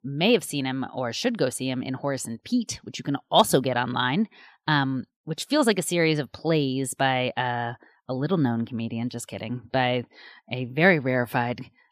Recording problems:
none

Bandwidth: 14.5 kHz